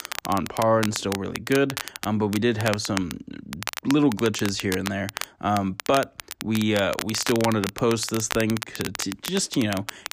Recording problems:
crackle, like an old record; loud; 9 dB below the speech

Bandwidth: 15 kHz